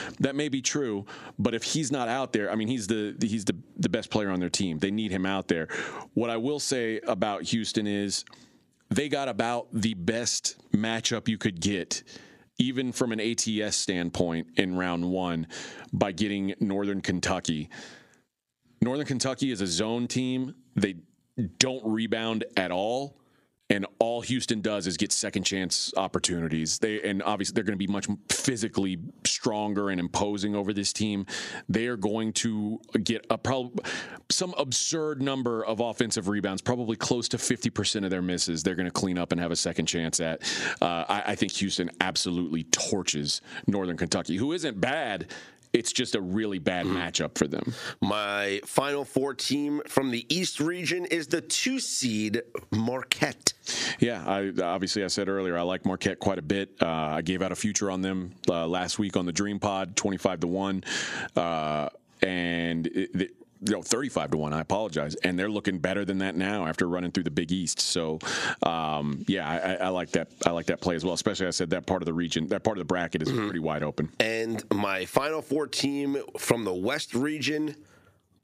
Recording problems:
squashed, flat; somewhat

